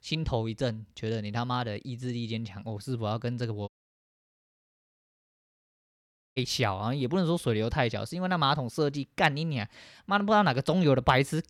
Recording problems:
audio cutting out; at 3.5 s for 2.5 s

